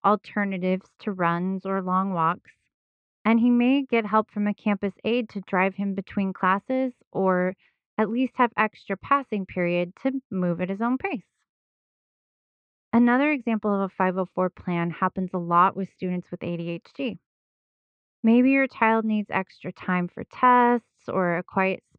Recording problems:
muffled; very; fading above 2.5 kHz

